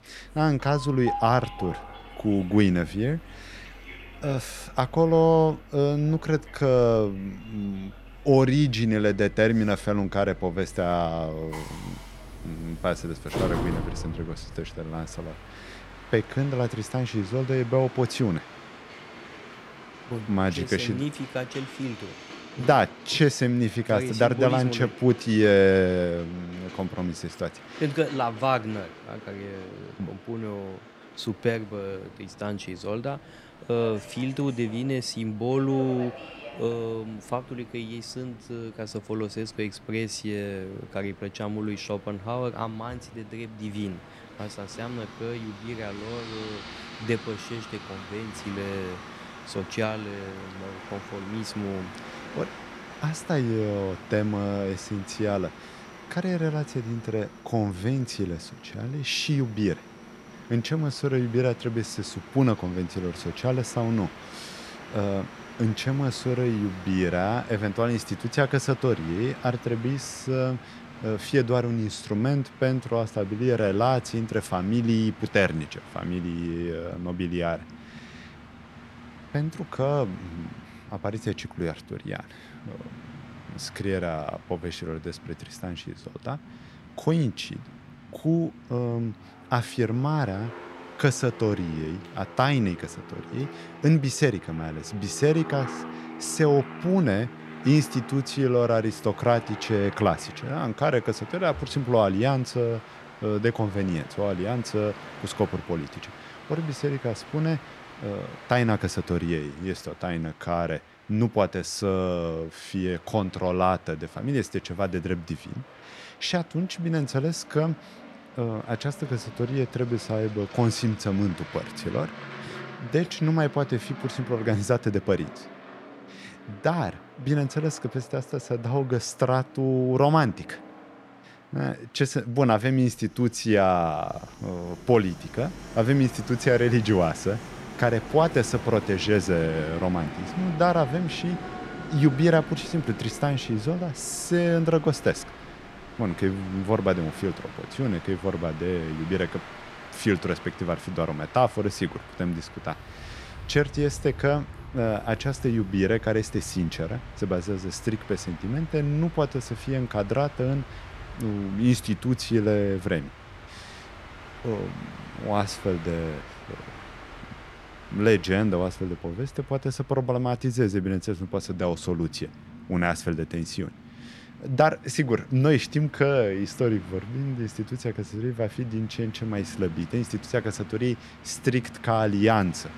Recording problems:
train or aircraft noise; noticeable; throughout; 15 dB below the speech

